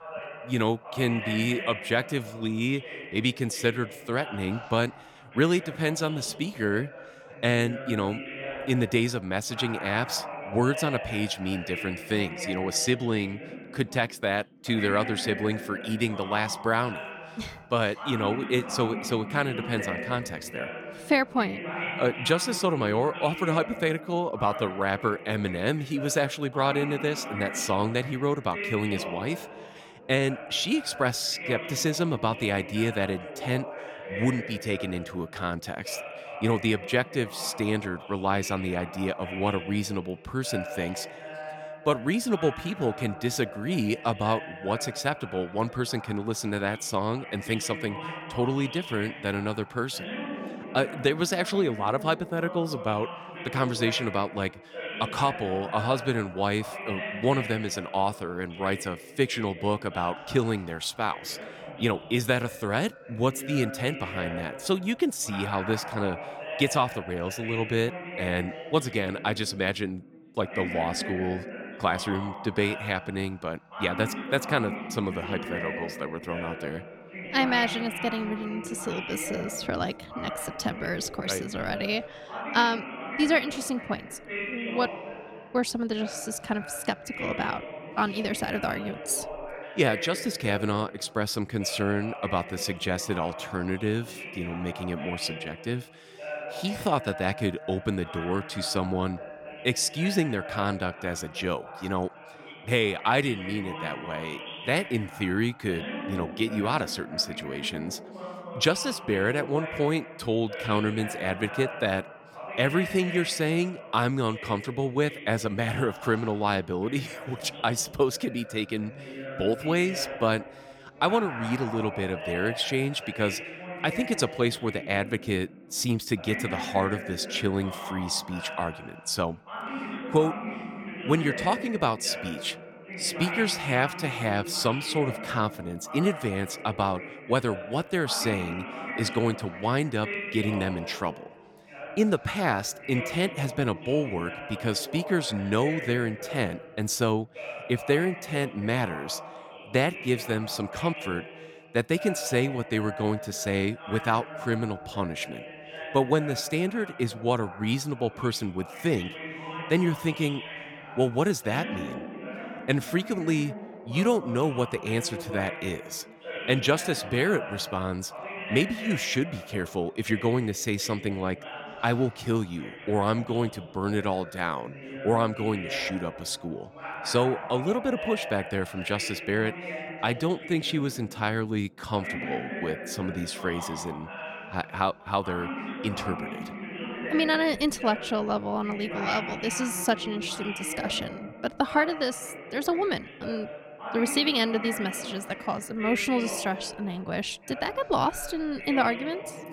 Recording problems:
background chatter; loud; throughout; 2 voices, 9 dB below the speech

